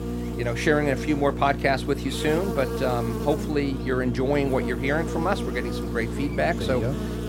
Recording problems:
electrical hum; loud; throughout; 60 Hz, 8 dB below the speech

